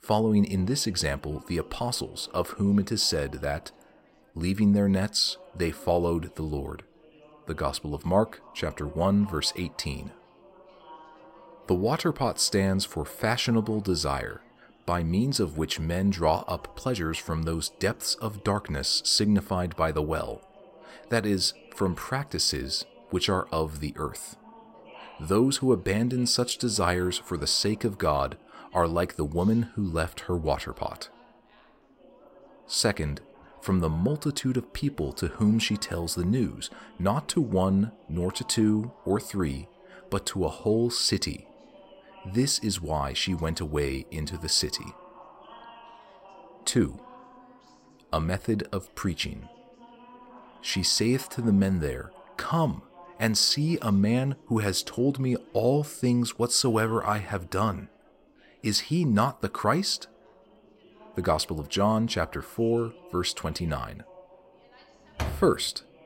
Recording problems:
background chatter; faint; throughout; 4 voices, 25 dB below the speech
door banging; noticeable; at 1:05; peak 7 dB below the speech

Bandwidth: 16 kHz